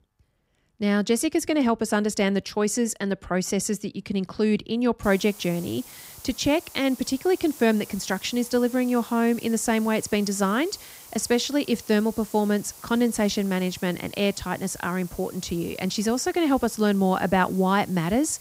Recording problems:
hiss; noticeable; from 5 s on; 20 dB below the speech

